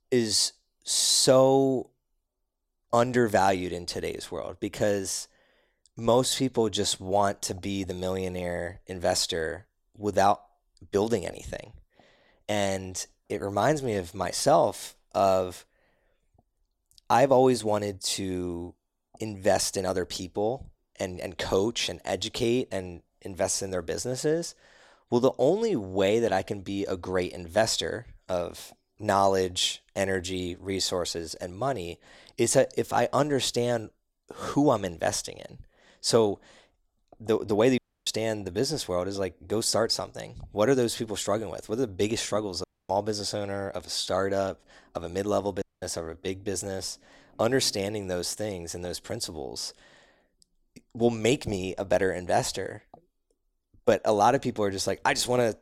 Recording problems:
audio cutting out; at 38 s, at 43 s and at 46 s

